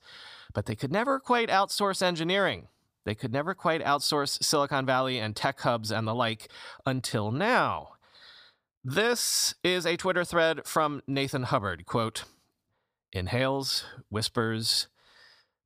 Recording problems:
none

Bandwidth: 15 kHz